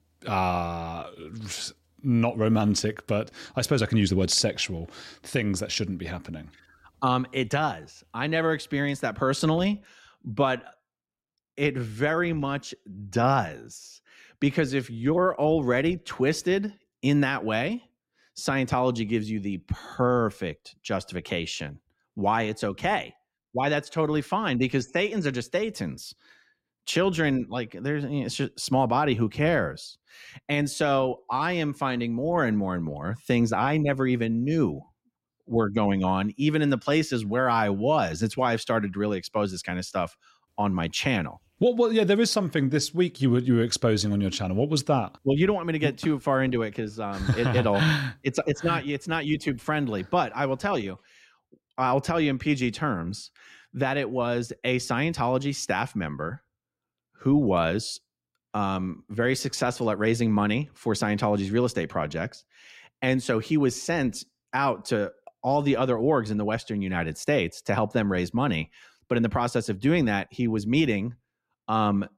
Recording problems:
none

